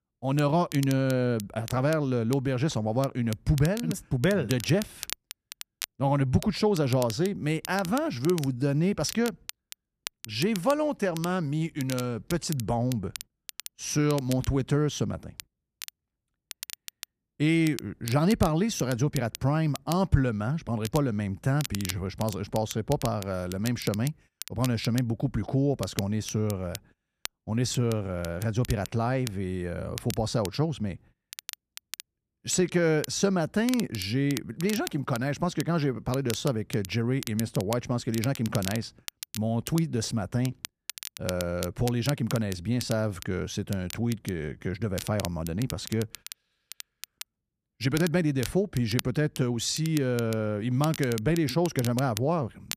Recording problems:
crackle, like an old record; noticeable; 15 dB below the speech

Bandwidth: 14.5 kHz